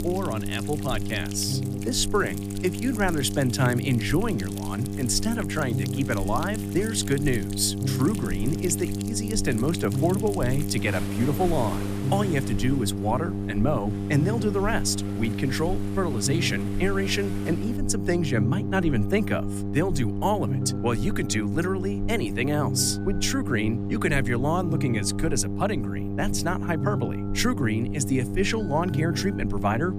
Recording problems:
electrical hum; loud; throughout; 50 Hz, 8 dB below the speech
rain or running water; noticeable; throughout; 15 dB below the speech
alarms or sirens; faint; throughout; 25 dB below the speech

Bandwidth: 15 kHz